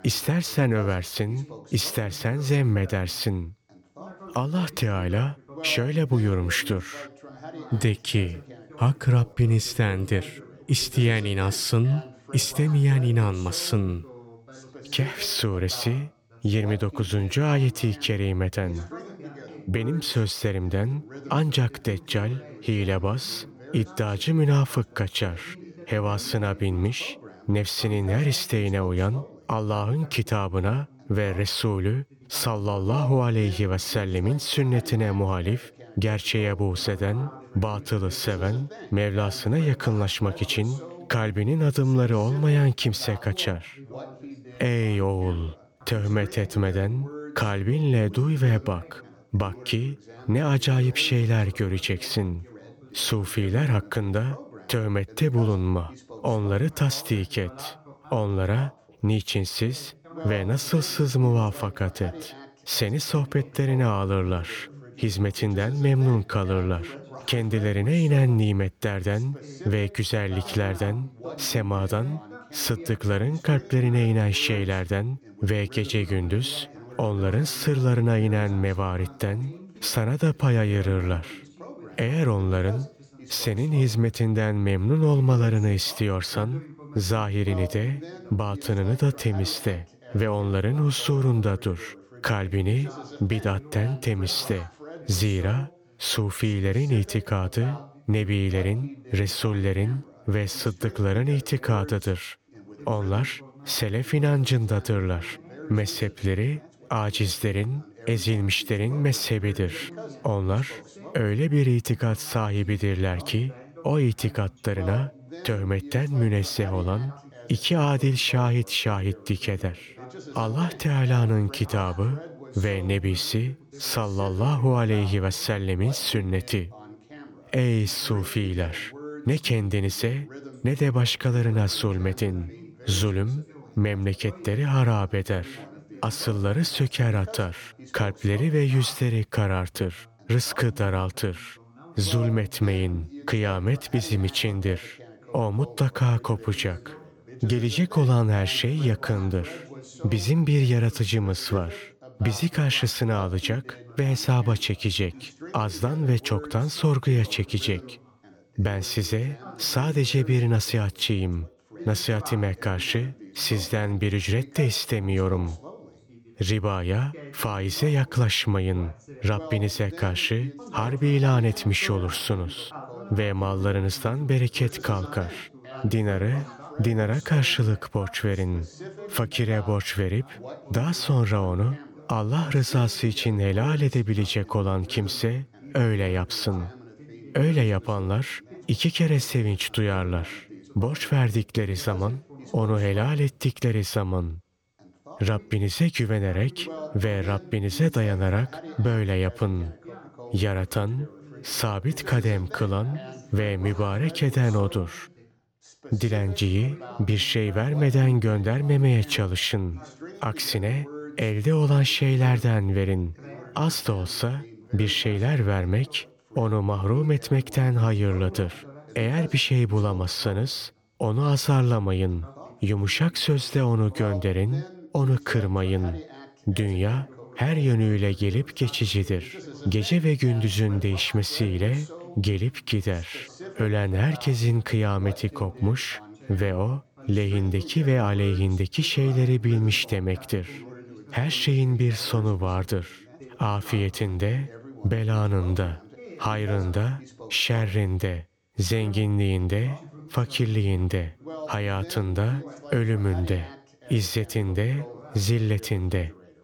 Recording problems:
background chatter; noticeable; throughout; 2 voices, 20 dB below the speech

